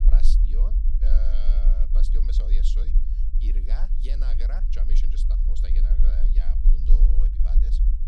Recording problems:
low rumble; loud; throughout; 3 dB below the speech

